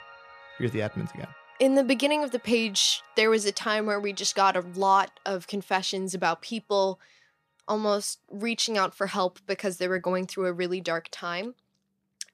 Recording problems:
background music; faint; throughout; 25 dB below the speech

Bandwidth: 14.5 kHz